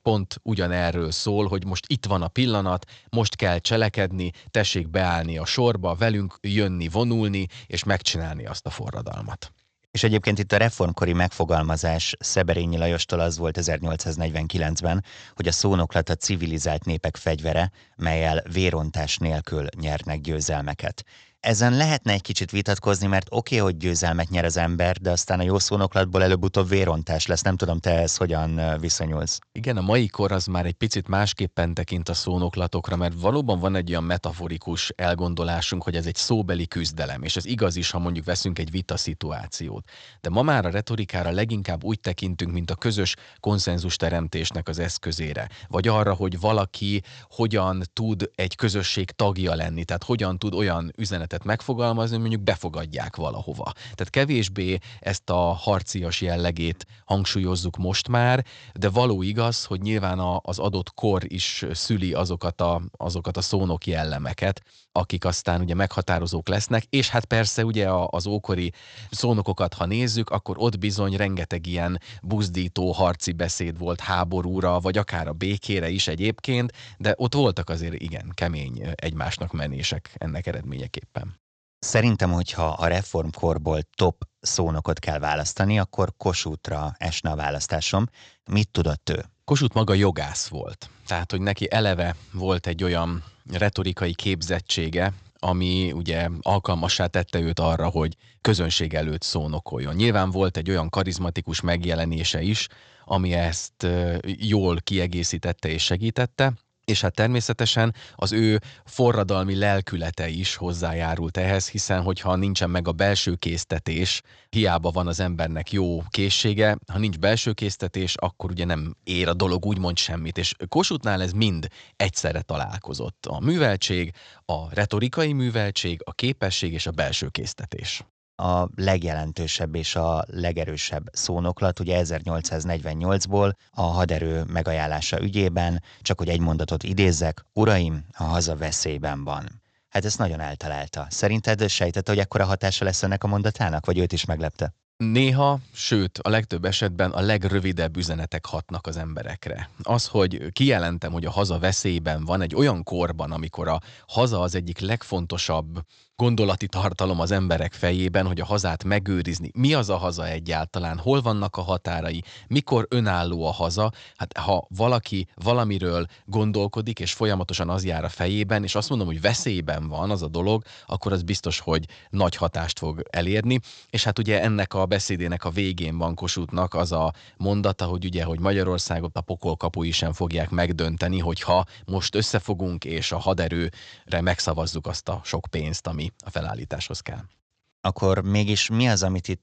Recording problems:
high frequencies cut off; noticeable; nothing above 8 kHz

